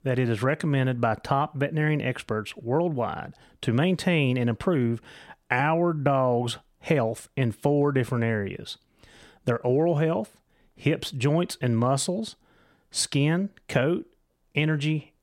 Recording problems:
none

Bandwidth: 16 kHz